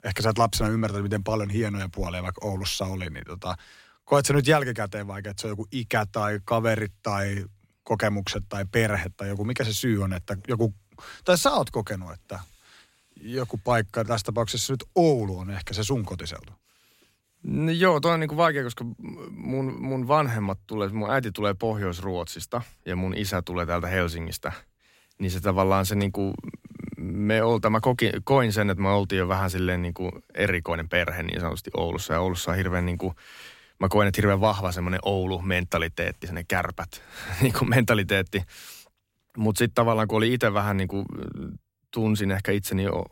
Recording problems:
uneven, jittery; slightly; from 11 to 42 s

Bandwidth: 16 kHz